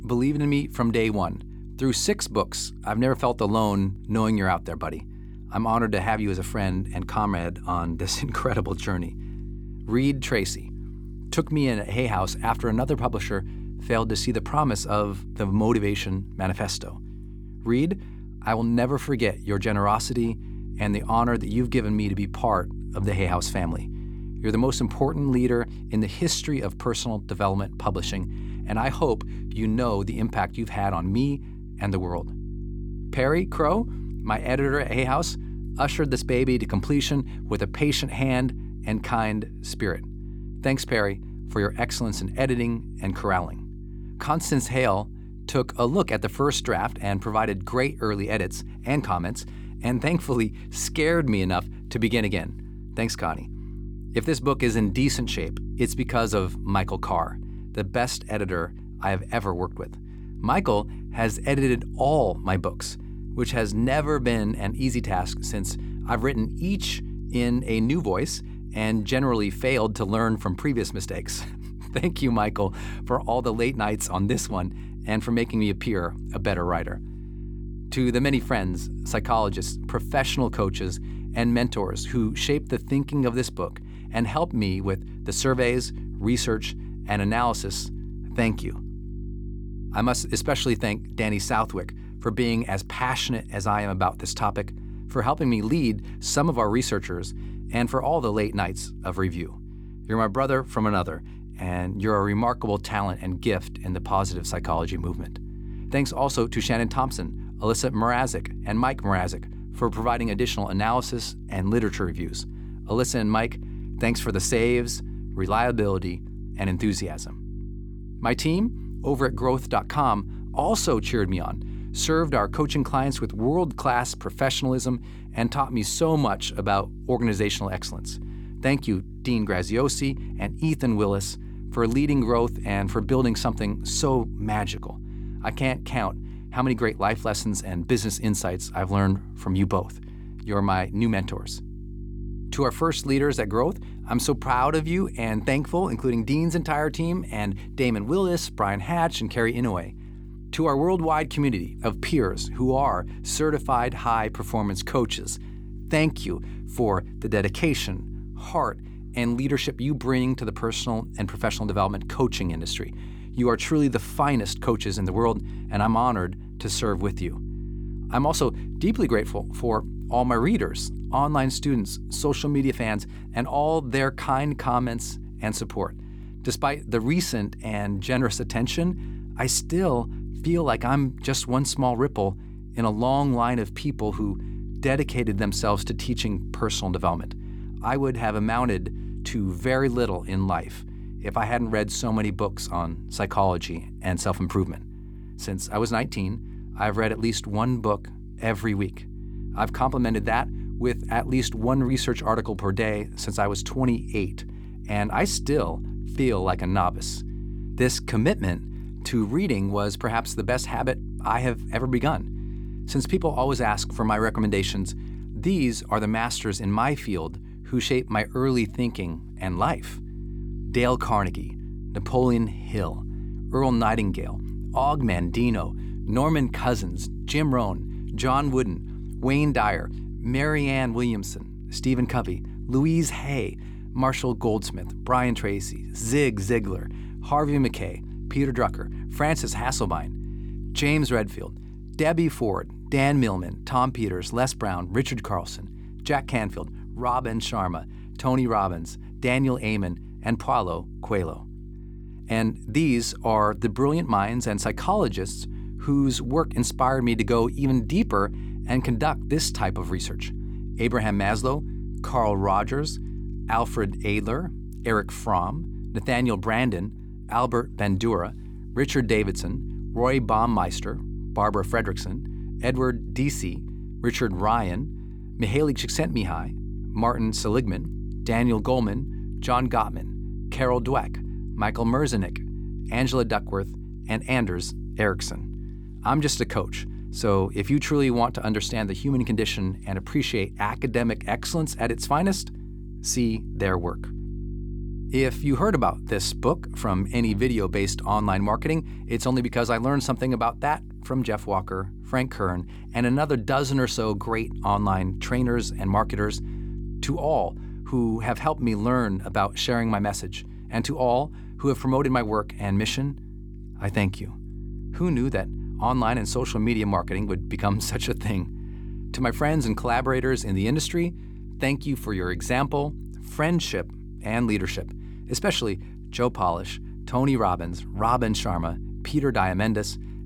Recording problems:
electrical hum; faint; throughout; 50 Hz, 20 dB below the speech

